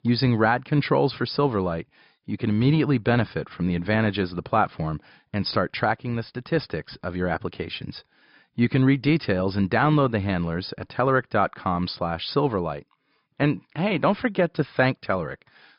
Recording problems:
high frequencies cut off; noticeable; nothing above 5.5 kHz

